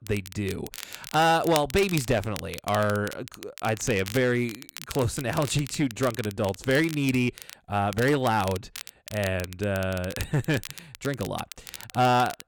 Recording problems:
distortion; slight; 4% of the sound clipped
crackle, like an old record; noticeable; 15 dB below the speech

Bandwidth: 18 kHz